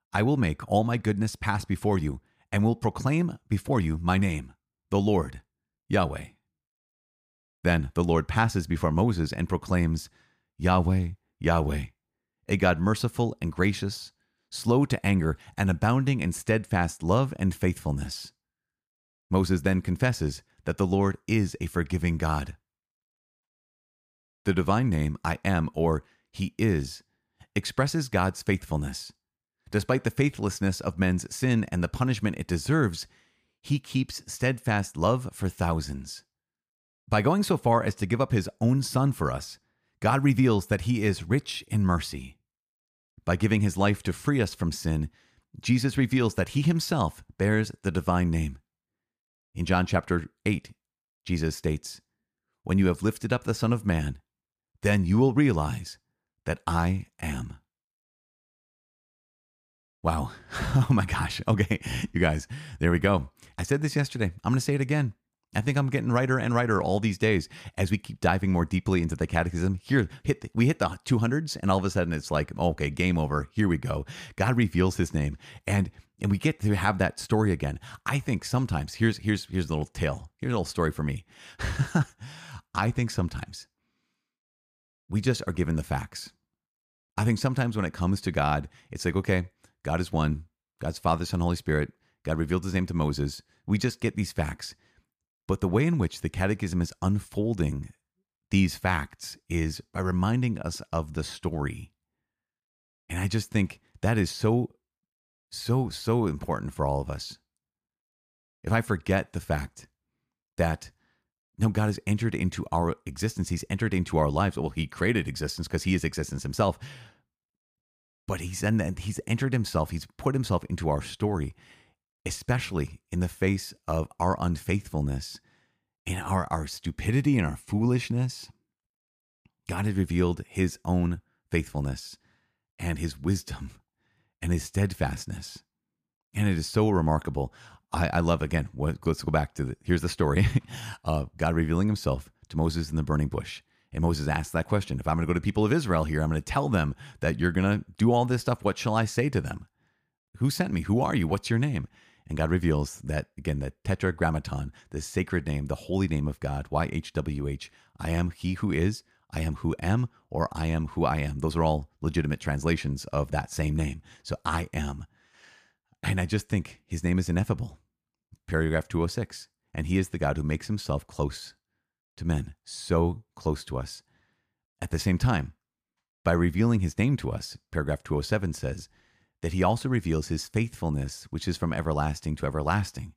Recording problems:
none

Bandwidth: 15 kHz